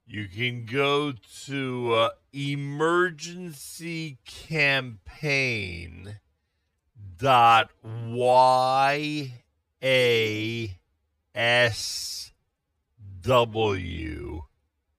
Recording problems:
wrong speed, natural pitch; too slow; 0.5 times normal speed

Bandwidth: 15 kHz